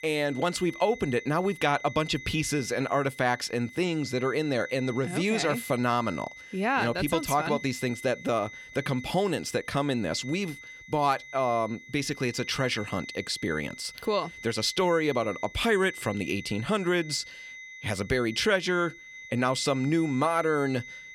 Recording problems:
high-pitched whine; noticeable; throughout; 2 kHz, 15 dB below the speech

